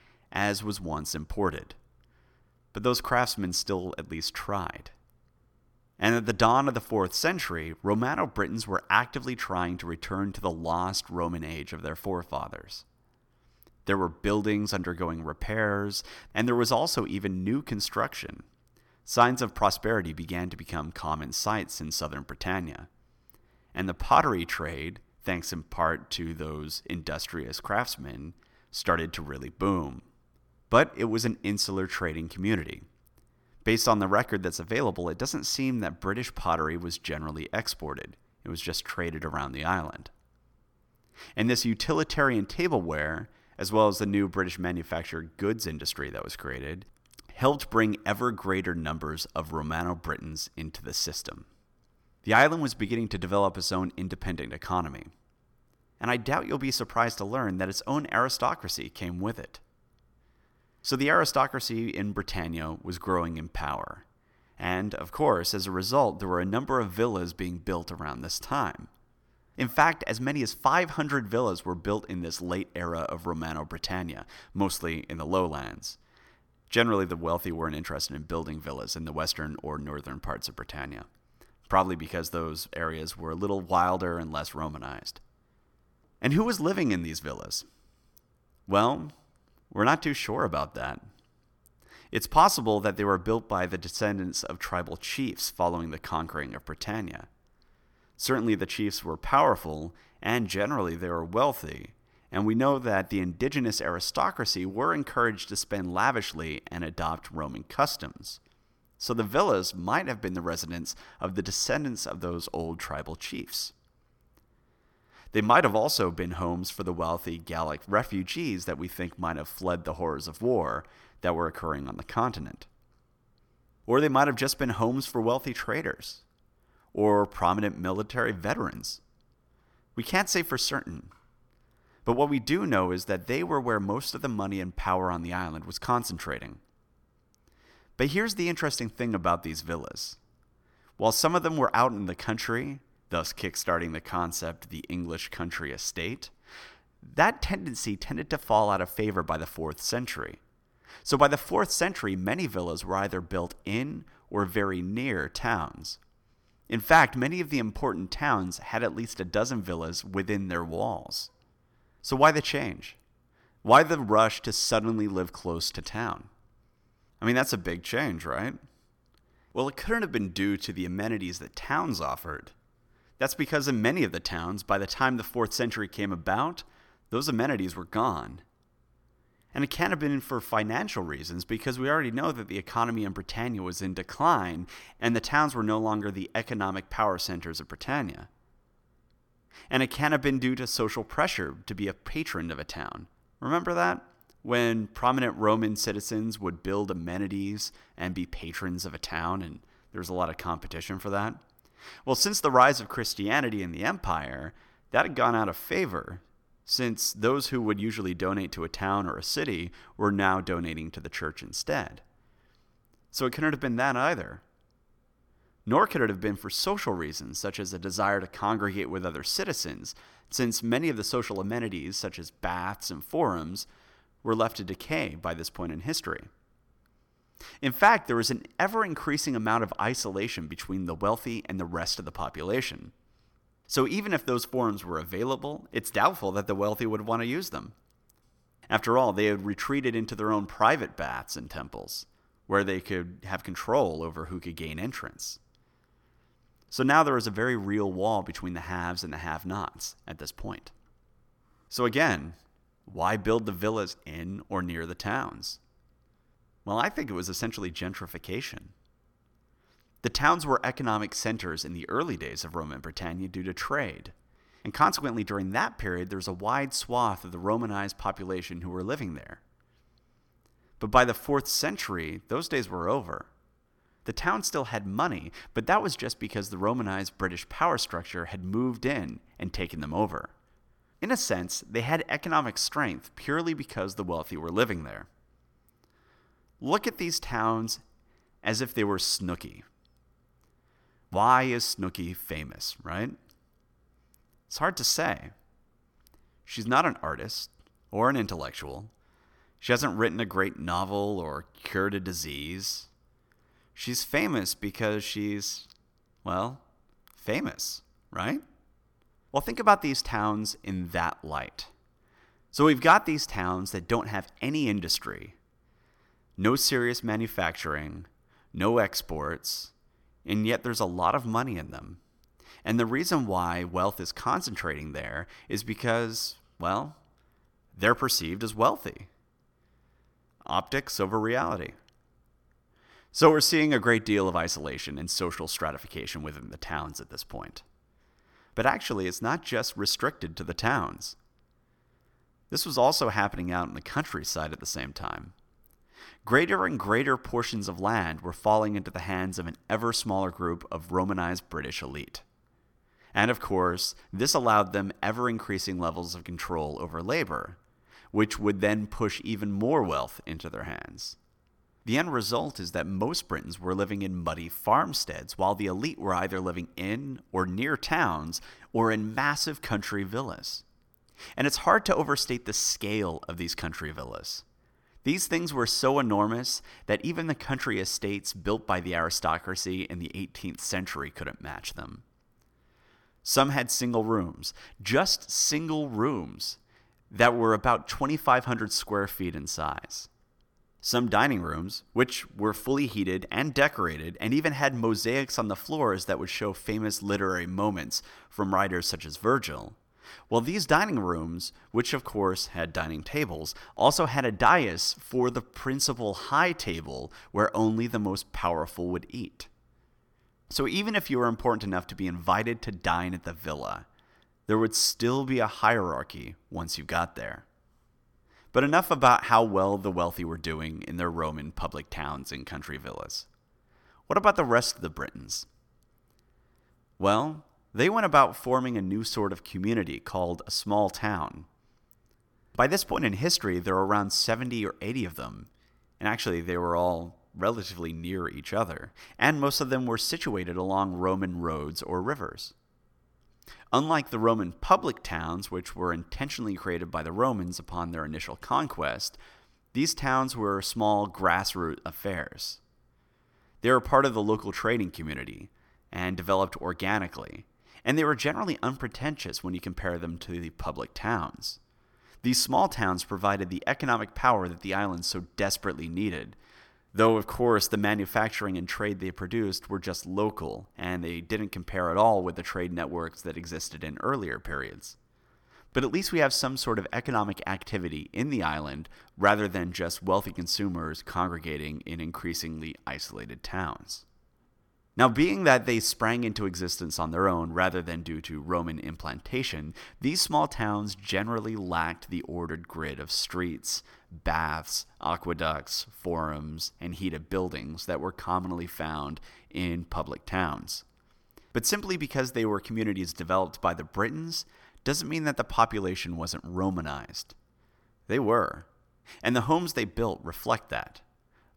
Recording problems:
none

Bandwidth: 18 kHz